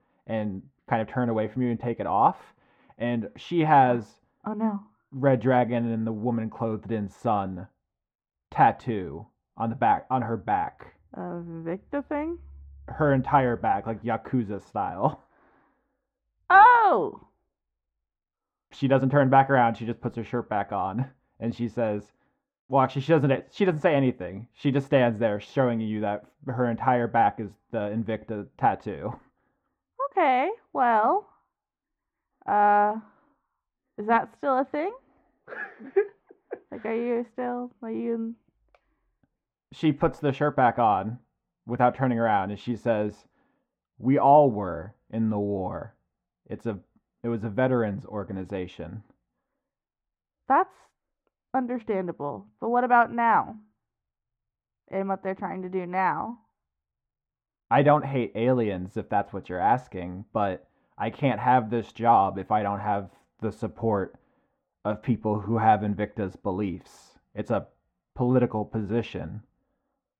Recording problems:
muffled; very; fading above 3.5 kHz

